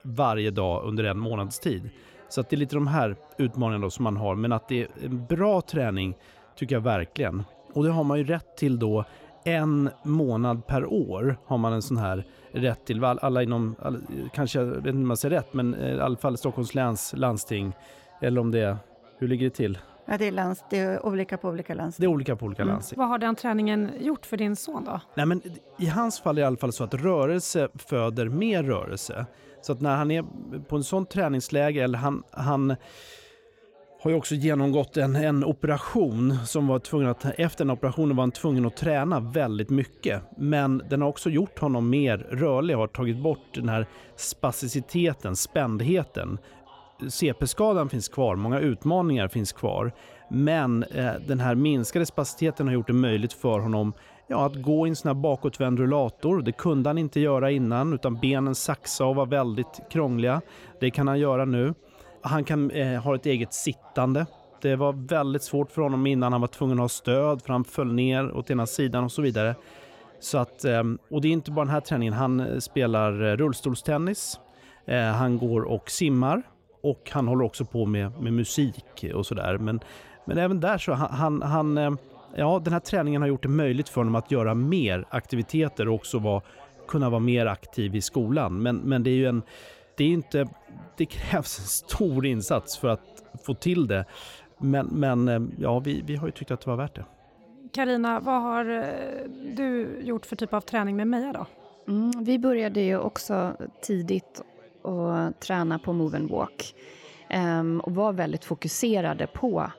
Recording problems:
background chatter; faint; throughout; 3 voices, 25 dB below the speech

